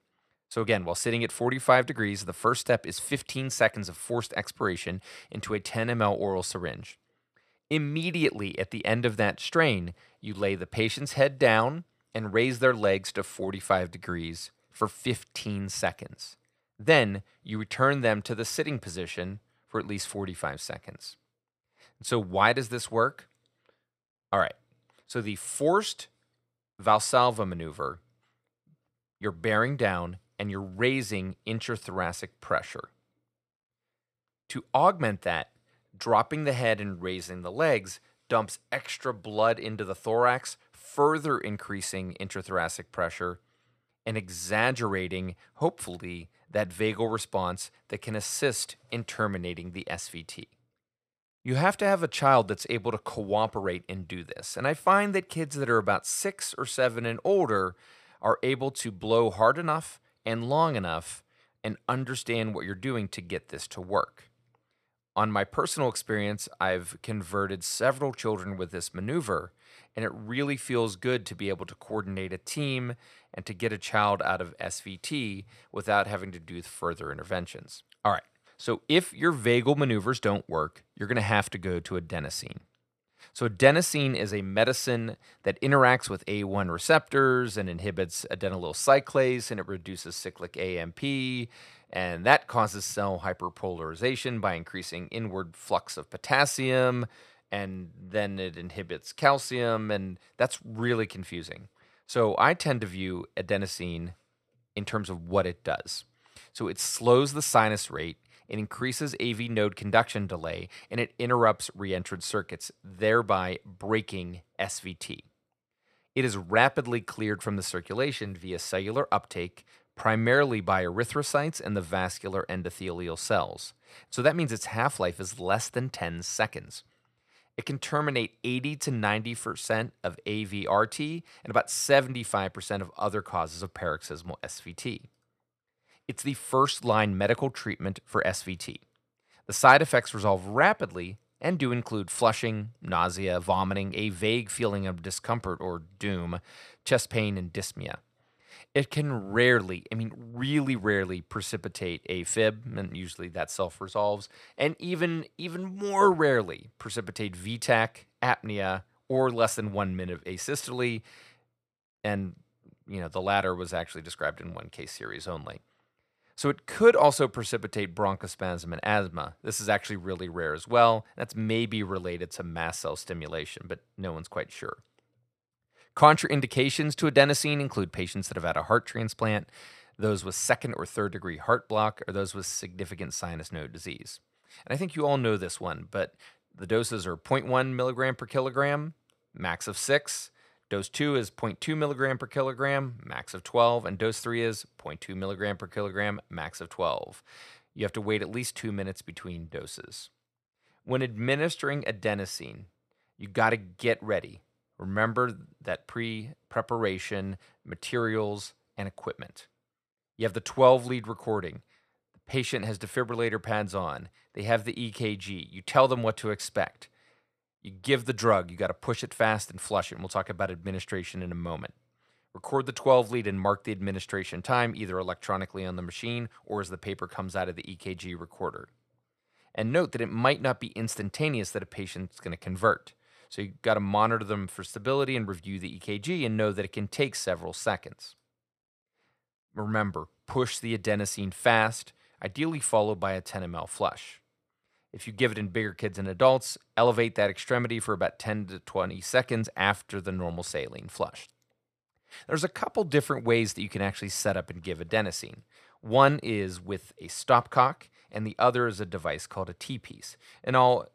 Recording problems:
none

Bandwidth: 14.5 kHz